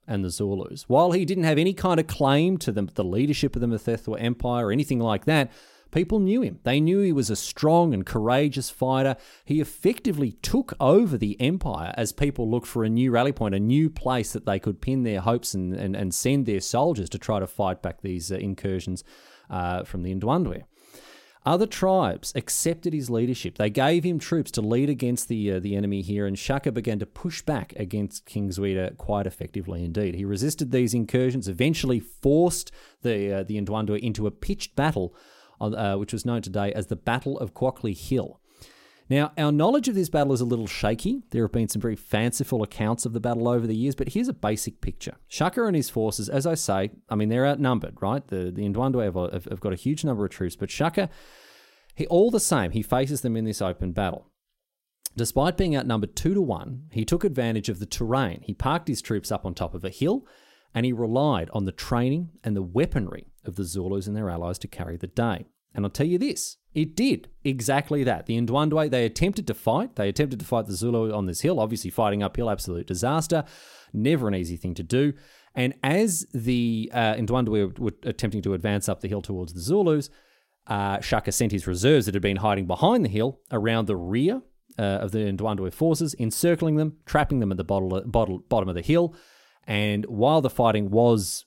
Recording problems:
none

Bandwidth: 16 kHz